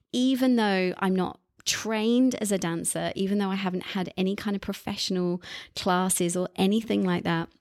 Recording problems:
none

